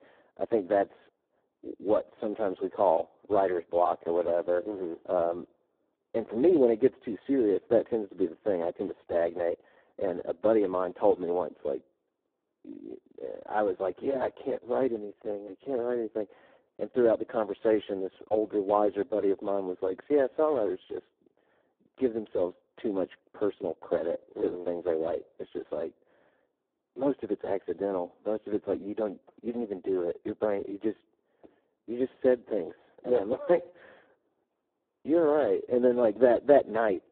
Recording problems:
phone-call audio; poor line; nothing above 3.5 kHz
muffled; very slightly; fading above 1.5 kHz

